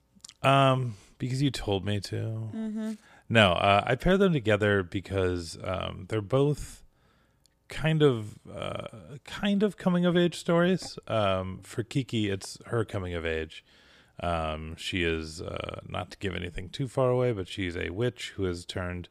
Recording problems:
none

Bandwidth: 15 kHz